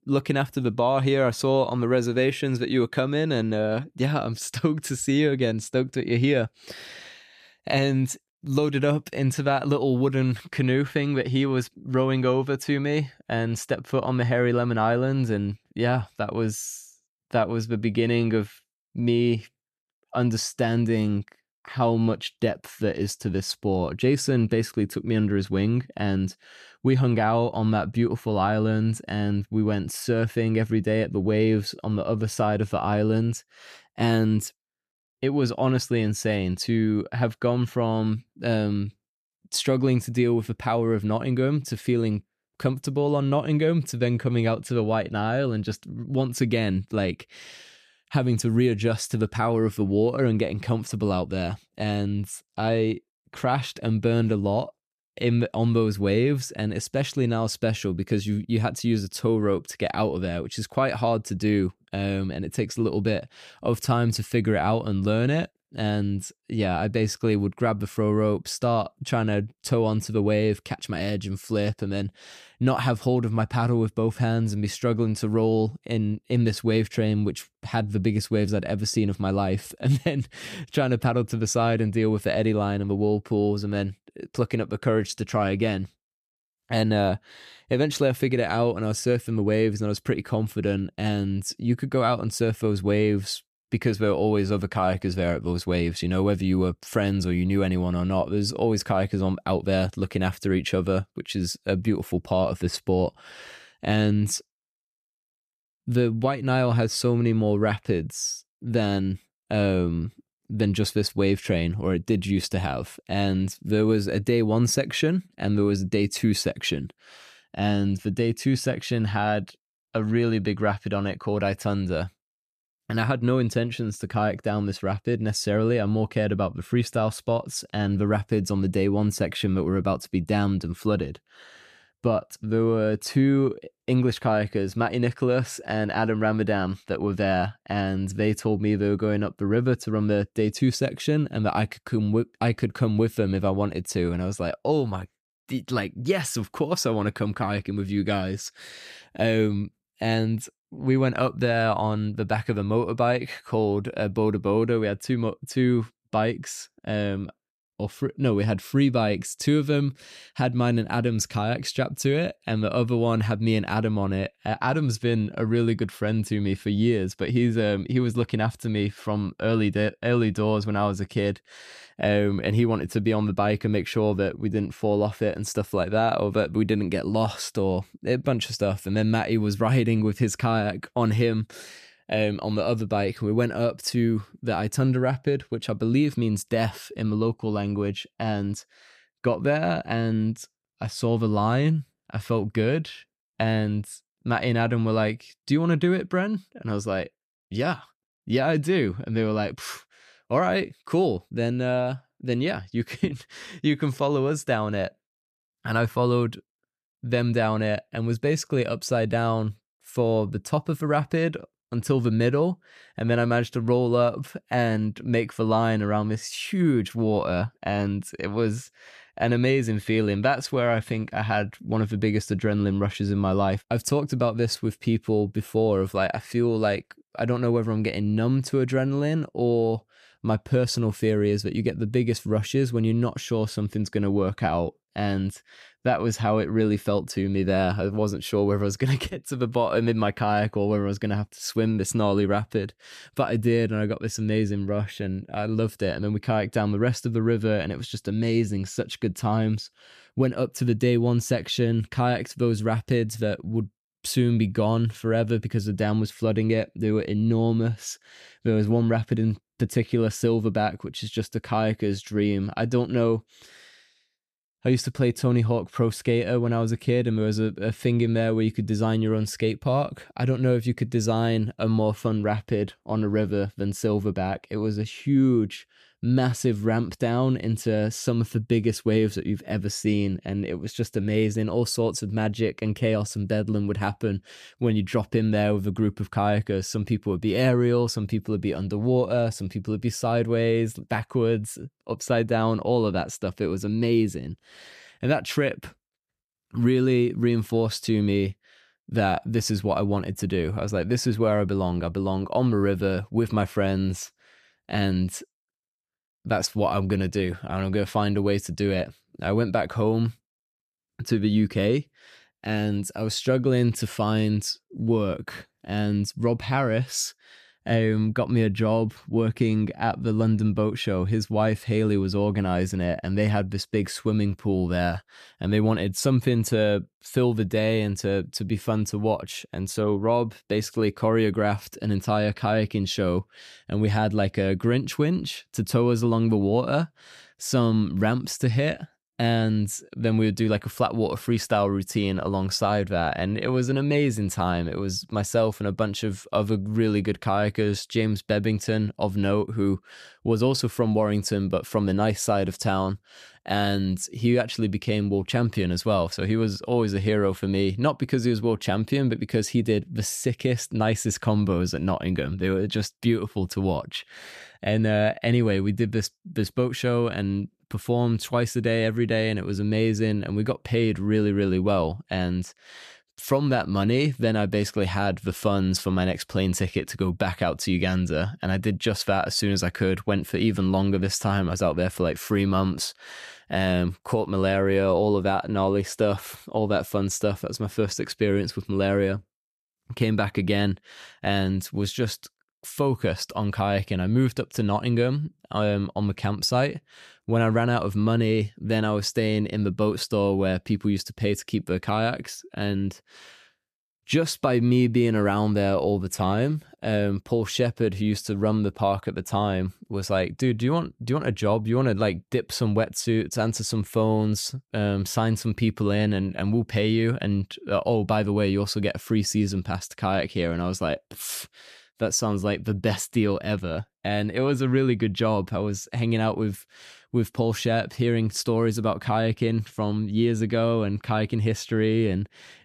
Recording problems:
none

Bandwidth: 14 kHz